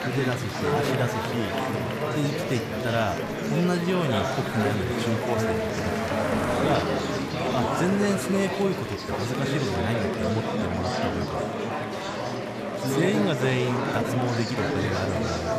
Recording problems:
chatter from many people; very loud; throughout; 1 dB above the speech
animal sounds; noticeable; throughout; 10 dB below the speech

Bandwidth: 14.5 kHz